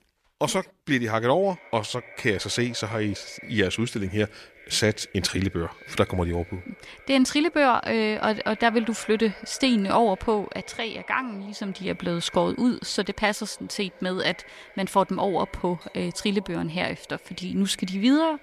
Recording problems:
echo of what is said; faint; throughout; 480 ms later, 20 dB below the speech

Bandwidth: 14.5 kHz